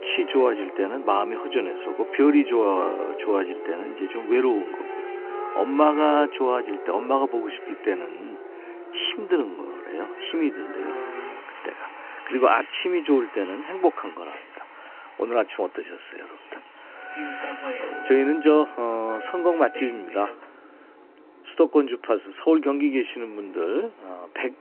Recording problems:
phone-call audio; nothing above 3 kHz
traffic noise; noticeable; throughout; 10 dB below the speech

